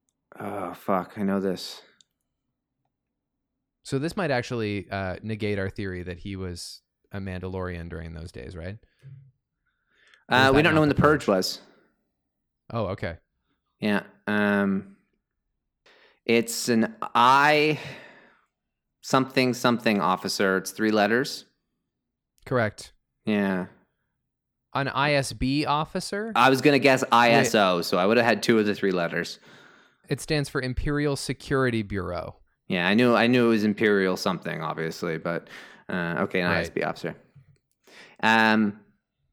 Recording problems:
none

